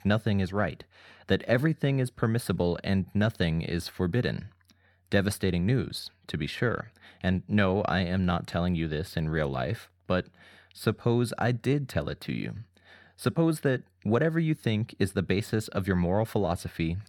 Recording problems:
none

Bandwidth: 17.5 kHz